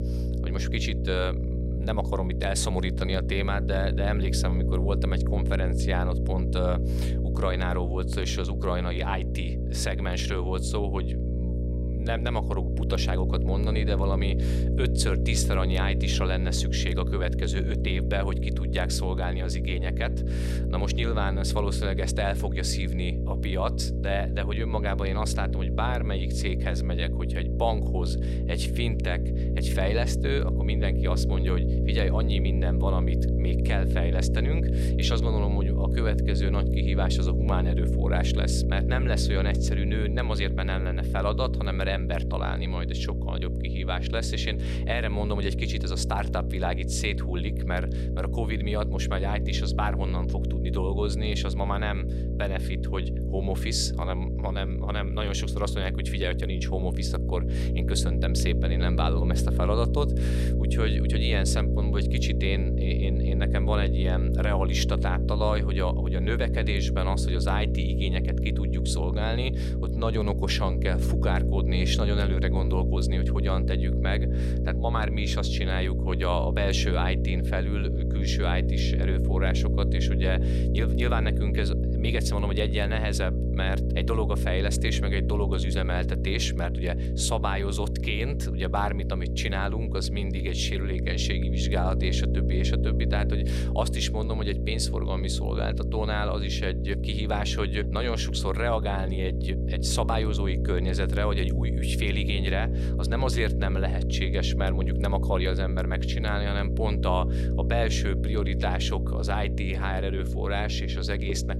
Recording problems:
electrical hum; loud; throughout; 60 Hz, 6 dB below the speech

